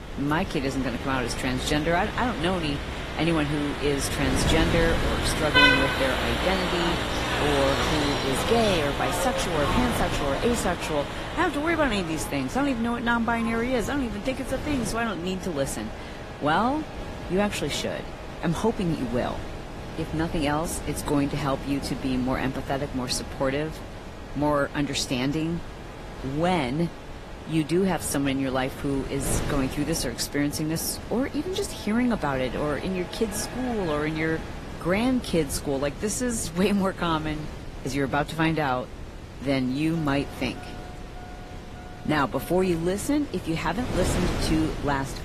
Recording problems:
garbled, watery; slightly; nothing above 14 kHz
traffic noise; loud; throughout; 3 dB below the speech
wind noise on the microphone; occasional gusts; 10 dB below the speech

